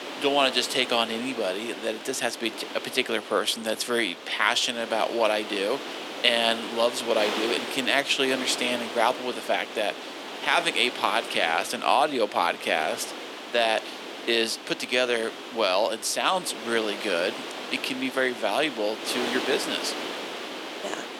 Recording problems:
thin; somewhat; fading below 300 Hz
wind noise on the microphone; heavy; 9 dB below the speech

